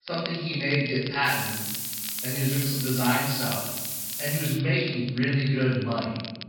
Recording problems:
room echo; strong; dies away in 1.1 s
off-mic speech; far
high frequencies cut off; noticeable; nothing above 5 kHz
hiss; loud; from 1.5 to 4.5 s; 3 dB below the speech
crackle, like an old record; noticeable; 15 dB below the speech

